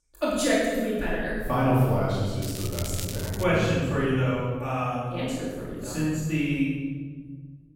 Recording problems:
room echo; strong; dies away in 1.8 s
off-mic speech; far
crackling; noticeable; from 2.5 to 3.5 s; 10 dB below the speech

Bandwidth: 16 kHz